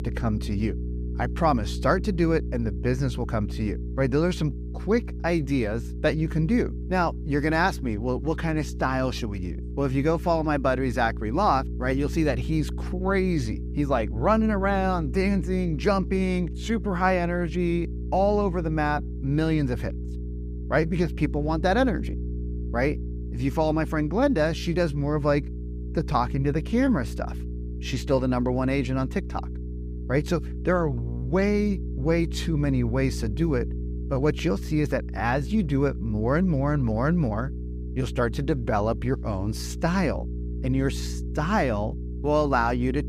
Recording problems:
electrical hum; noticeable; throughout; 60 Hz, 15 dB below the speech

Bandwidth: 15 kHz